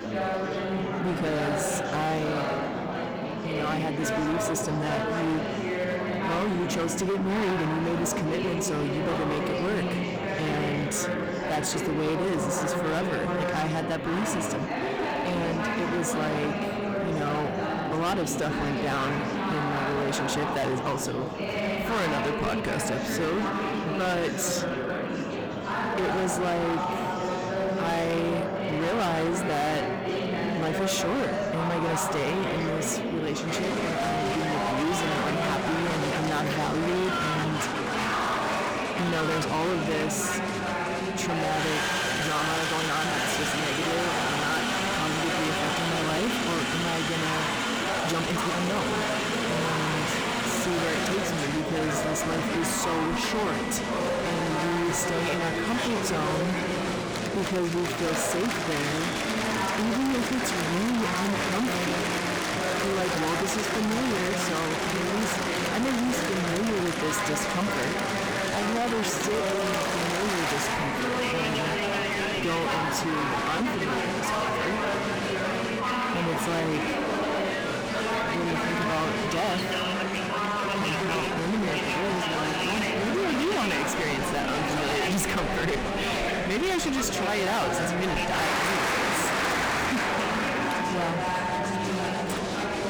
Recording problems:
distortion; heavy; 30% of the sound clipped
murmuring crowd; very loud; throughout; 1 dB above the speech
uneven, jittery; strongly; from 42 s to 1:21

